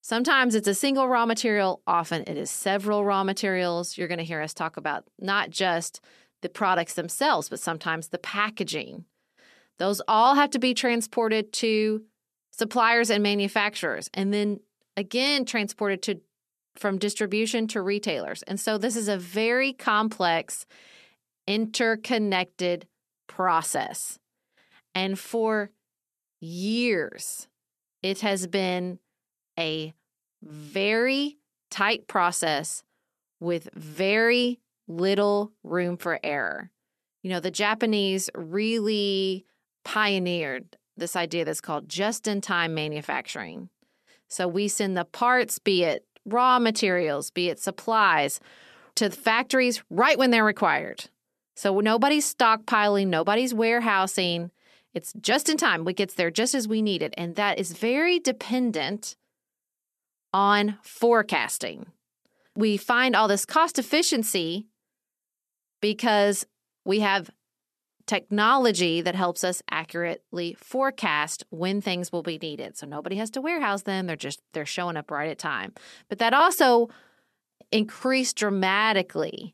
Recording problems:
none

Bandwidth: 13.5 kHz